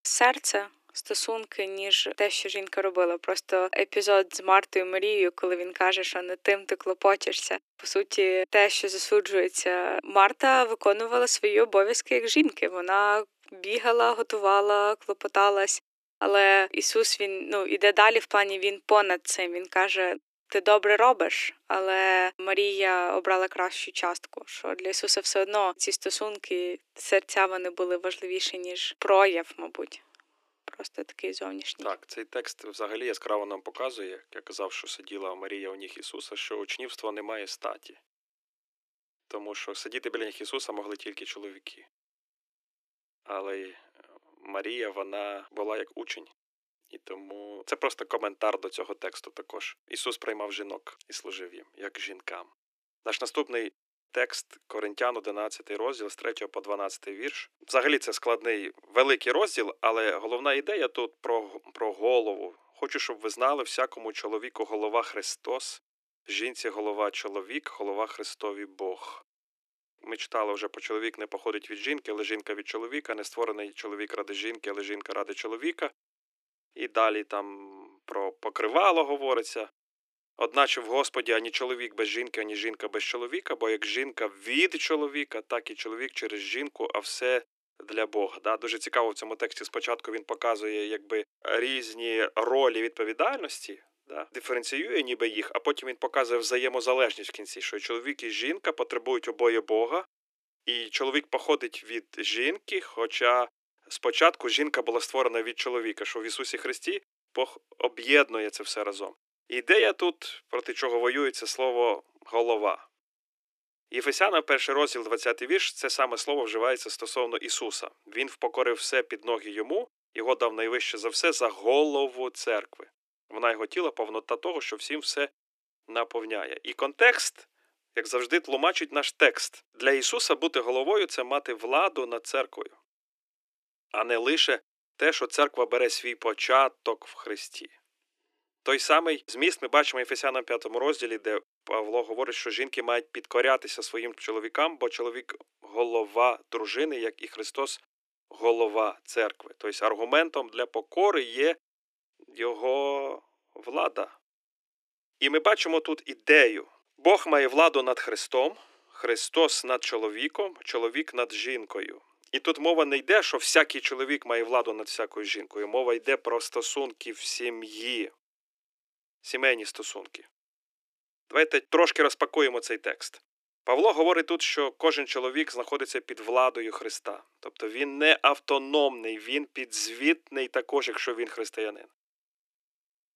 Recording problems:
thin; very; fading below 300 Hz

